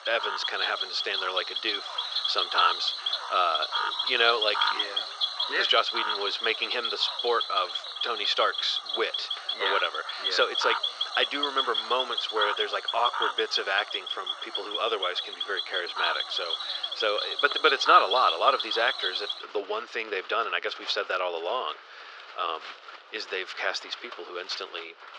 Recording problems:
thin; very; fading below 400 Hz
muffled; very slightly; fading above 4.5 kHz
animal sounds; loud; throughout; 1 dB below the speech

